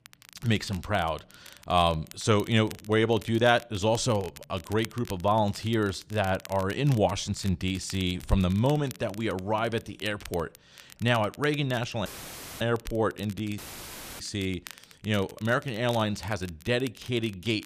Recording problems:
crackle, like an old record; faint; 20 dB below the speech
audio cutting out; filled with static; at 12 s for 0.5 s and at 14 s for 0.5 s

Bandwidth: 14.5 kHz